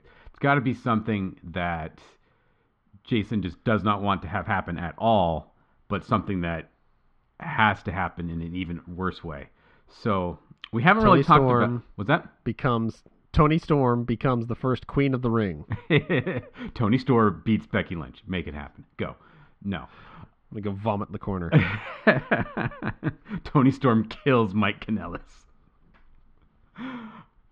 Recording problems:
muffled; slightly; fading above 3.5 kHz

